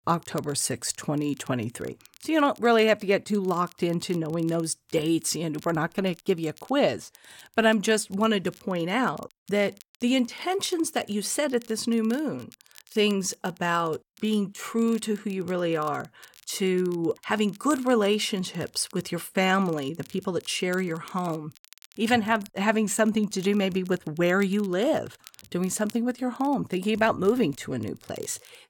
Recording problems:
crackle, like an old record; faint; 25 dB below the speech

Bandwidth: 17 kHz